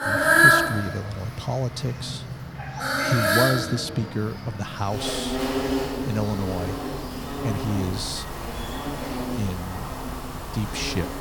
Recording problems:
animal sounds; very loud; throughout; 4 dB above the speech

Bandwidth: 18.5 kHz